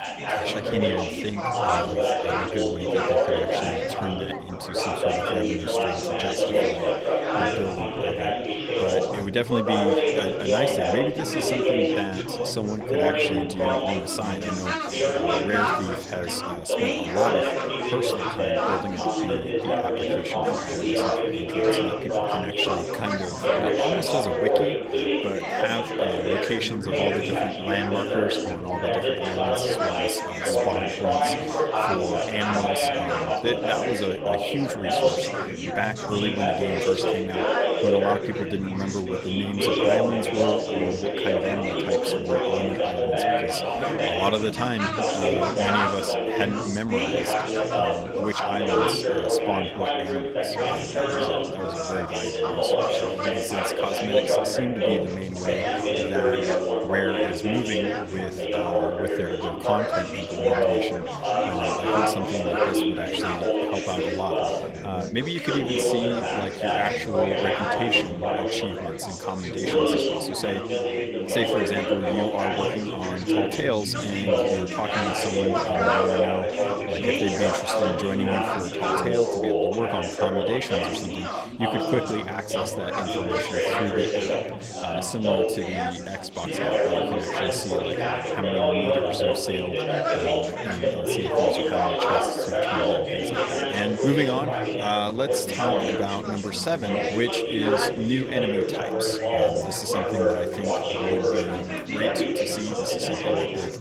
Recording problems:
garbled, watery; slightly; nothing above 15.5 kHz
chatter from many people; very loud; throughout; 5 dB above the speech

